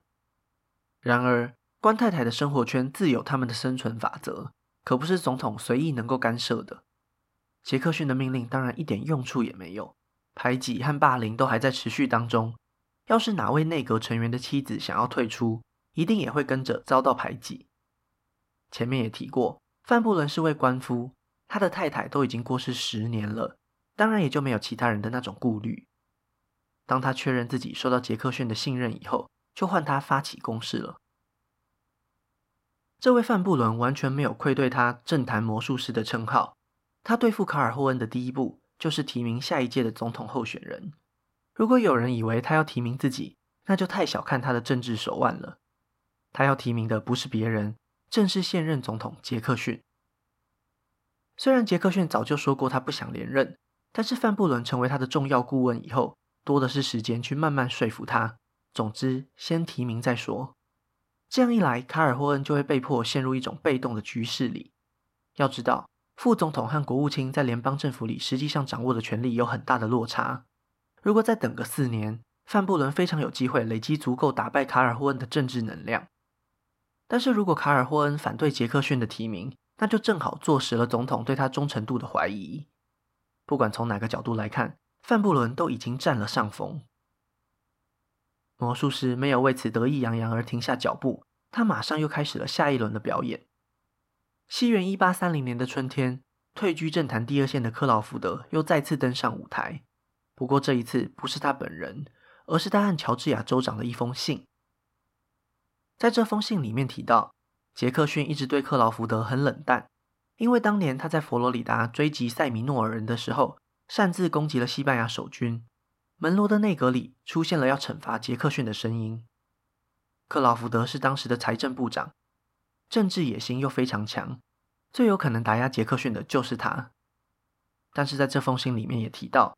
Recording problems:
muffled; slightly; fading above 2.5 kHz

